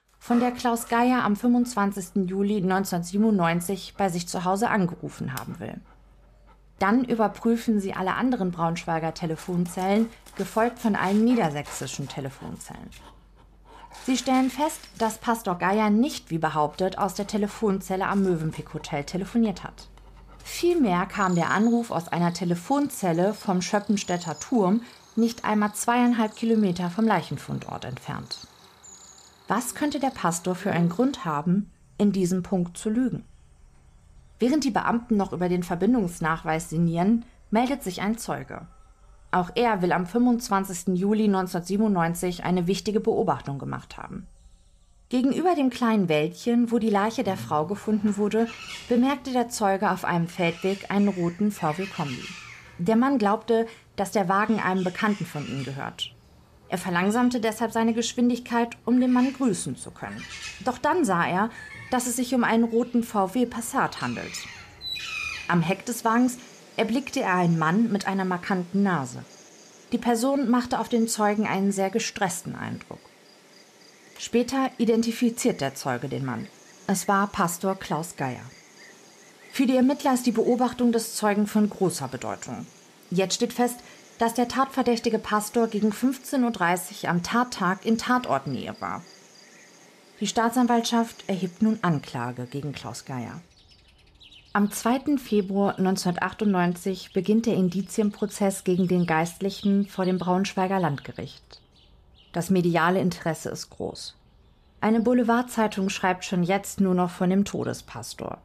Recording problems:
animal sounds; faint; throughout; 20 dB below the speech

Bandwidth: 14.5 kHz